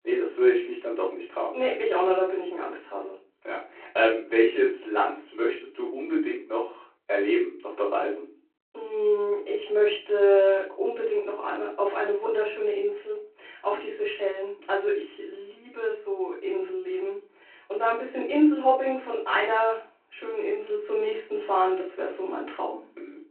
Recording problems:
off-mic speech; far
room echo; slight; dies away in 0.3 s
phone-call audio

